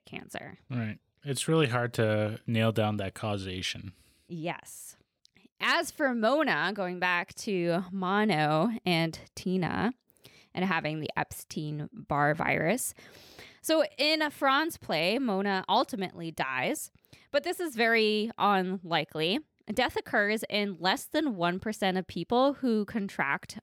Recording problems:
none

